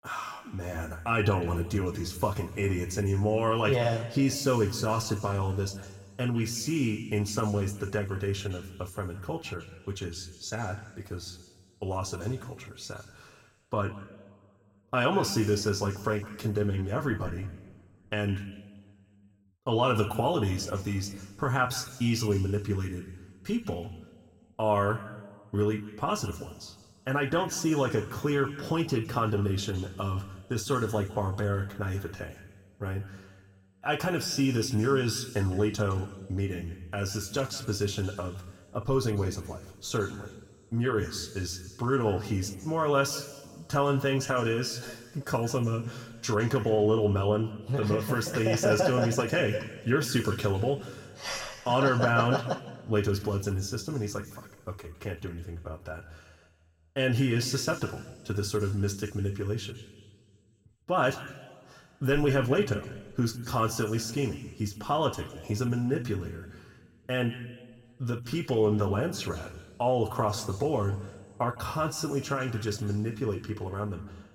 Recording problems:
room echo; slight; dies away in 1.5 s
off-mic speech; somewhat distant

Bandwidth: 16.5 kHz